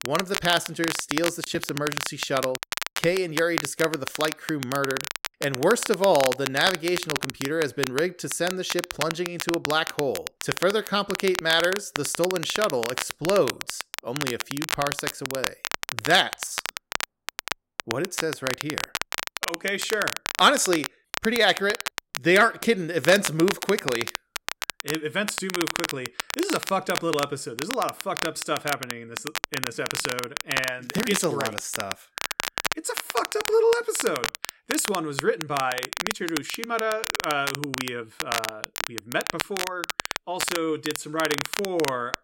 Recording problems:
crackle, like an old record; loud; 5 dB below the speech

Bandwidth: 16 kHz